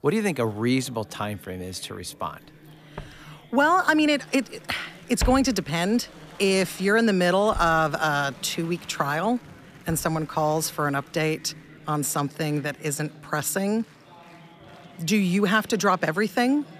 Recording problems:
murmuring crowd; faint; throughout; 25 dB below the speech
footsteps; noticeable; from 3 to 10 s; peak 6 dB below the speech

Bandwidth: 14.5 kHz